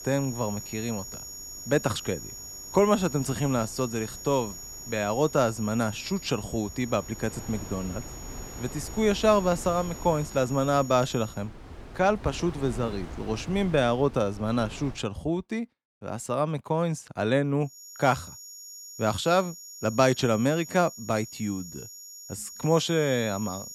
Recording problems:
high-pitched whine; noticeable; until 11 s and from 18 s on; 7 kHz, 15 dB below the speech
wind noise on the microphone; occasional gusts; until 15 s; 20 dB below the speech

